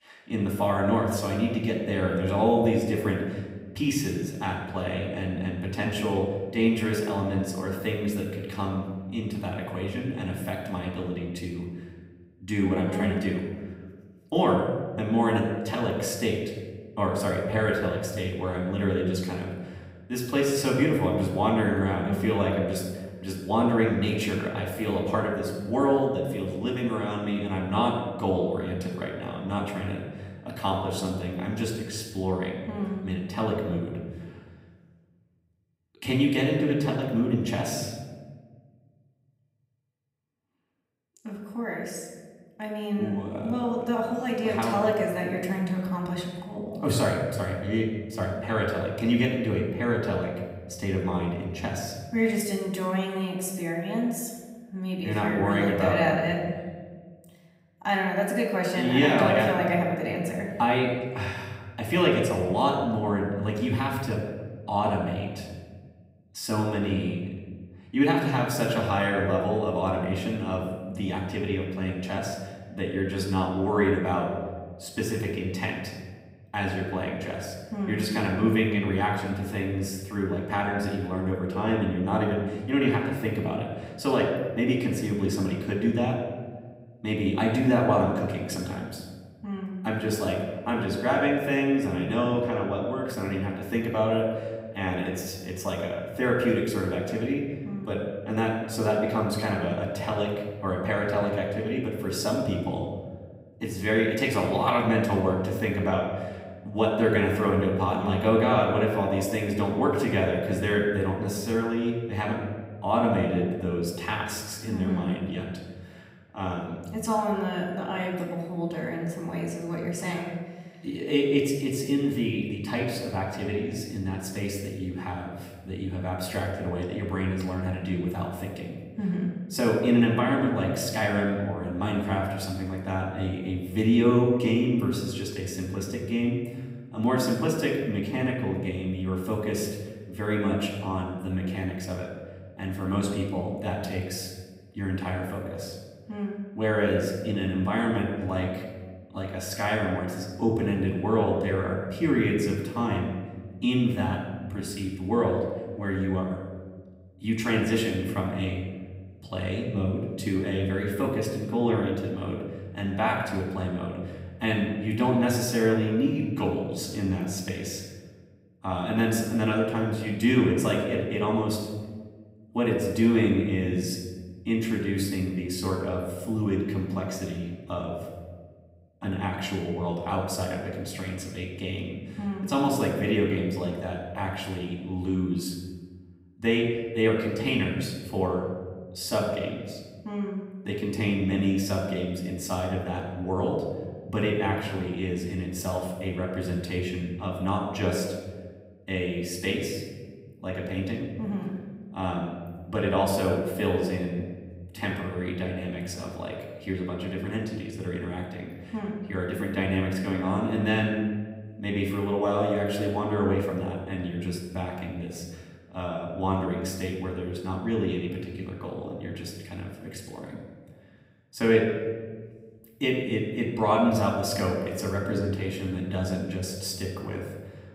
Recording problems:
off-mic speech; far
room echo; noticeable; dies away in 1.3 s

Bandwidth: 15.5 kHz